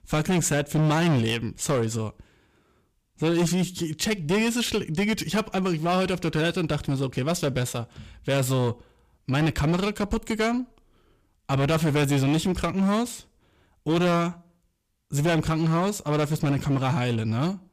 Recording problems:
distortion; heavy; 12% of the sound clipped

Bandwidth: 15 kHz